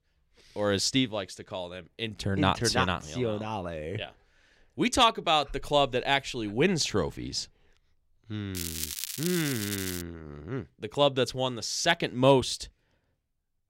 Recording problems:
crackling; loud; from 8.5 to 10 s; 6 dB below the speech

